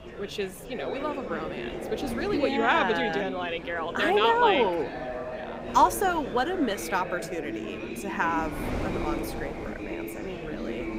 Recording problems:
chatter from many people; loud; throughout; 9 dB below the speech
wind noise on the microphone; occasional gusts; 20 dB below the speech

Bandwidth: 15.5 kHz